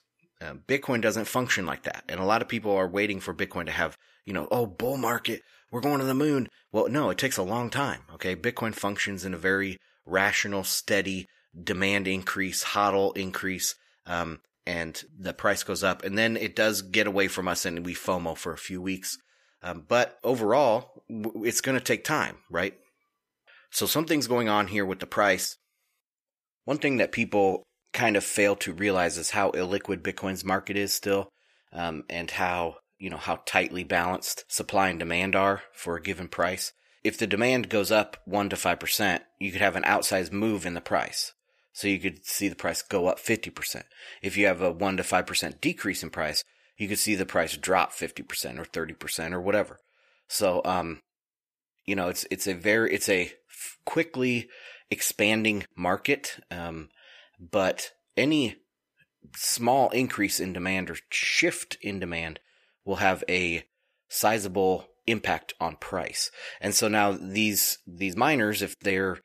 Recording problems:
thin; somewhat; fading below 650 Hz

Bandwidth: 14.5 kHz